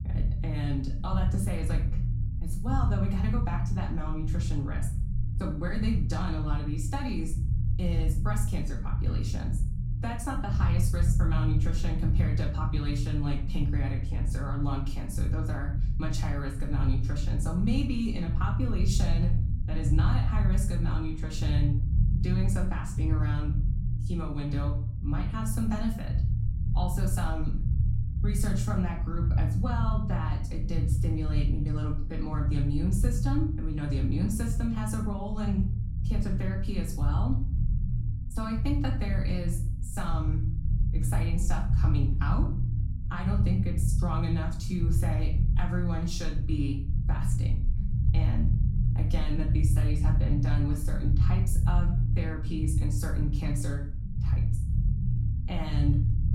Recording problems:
off-mic speech; far
room echo; slight; dies away in 0.4 s
low rumble; loud; throughout; 6 dB below the speech

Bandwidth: 16 kHz